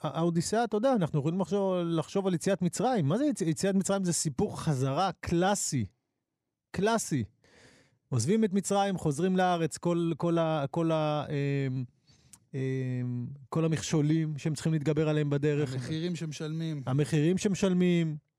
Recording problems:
none

